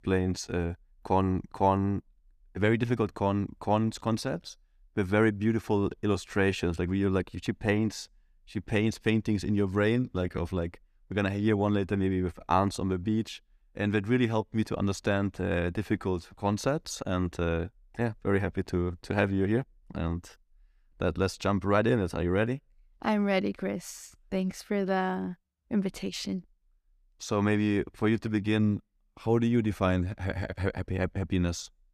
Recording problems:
none

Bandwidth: 14.5 kHz